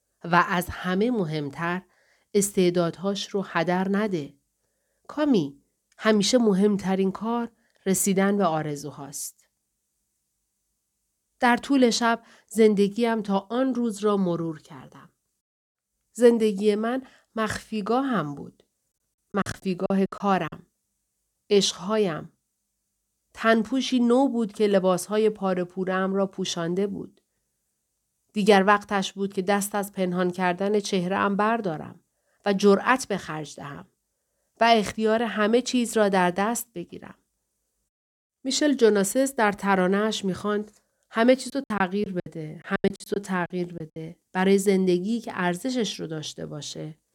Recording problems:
choppy; very; from 19 to 21 s and from 42 to 44 s; 19% of the speech affected

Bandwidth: 18 kHz